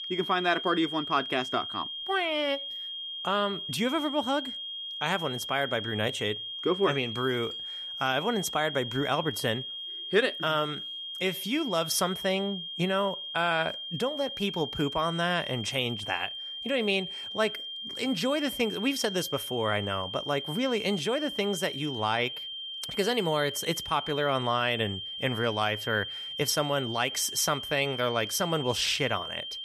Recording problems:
high-pitched whine; loud; throughout; 3 kHz, 6 dB below the speech

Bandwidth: 14.5 kHz